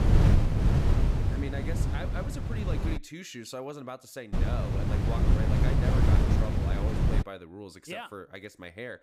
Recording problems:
wind noise on the microphone; heavy; until 3 s and from 4.5 to 7 s; 3 dB above the speech

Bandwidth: 15.5 kHz